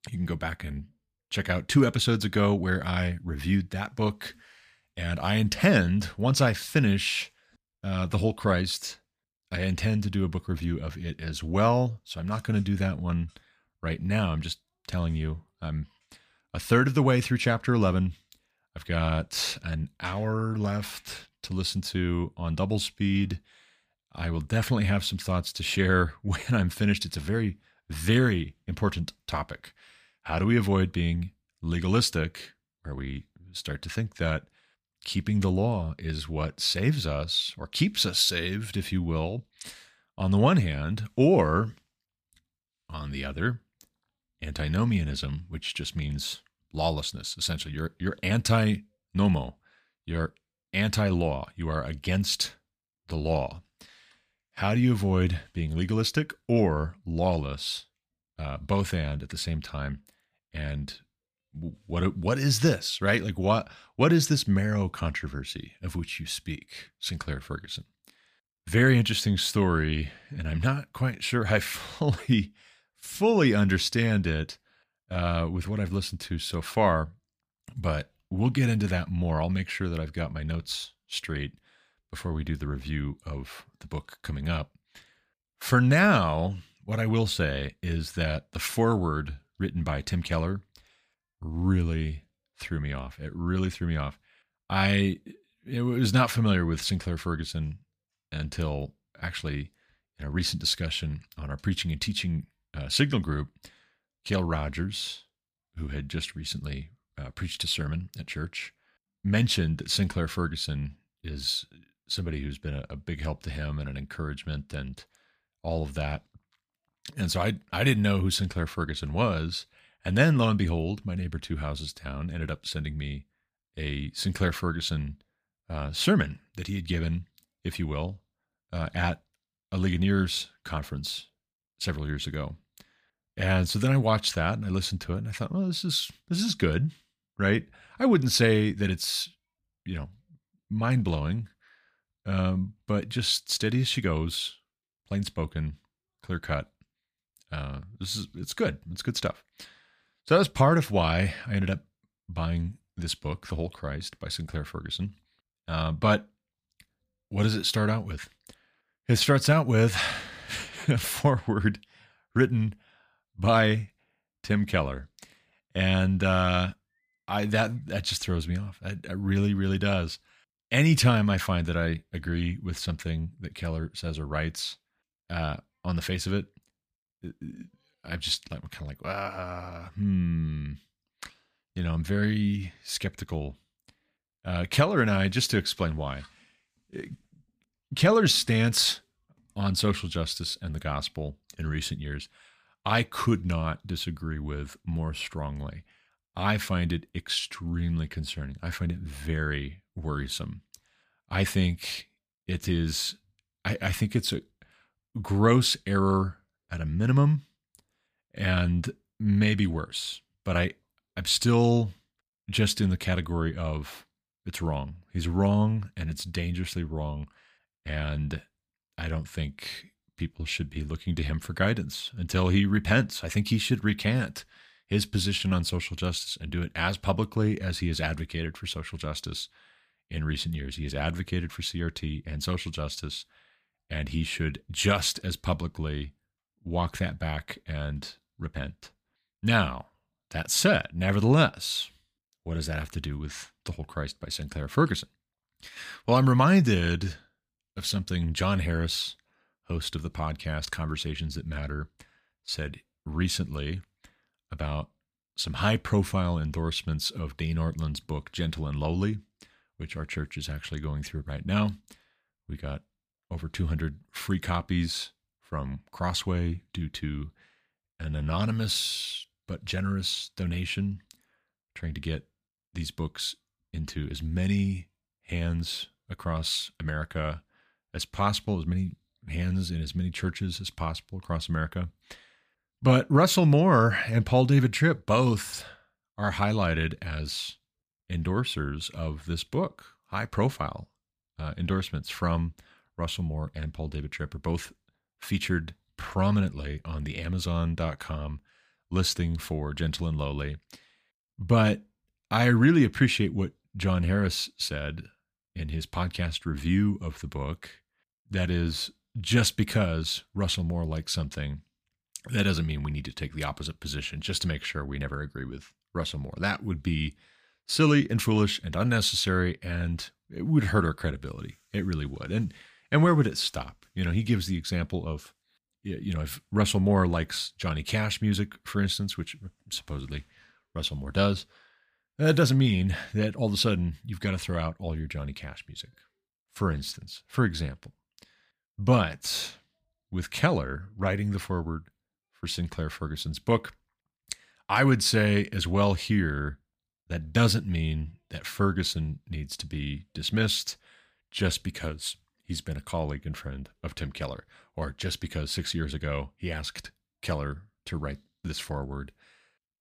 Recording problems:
none

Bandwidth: 15 kHz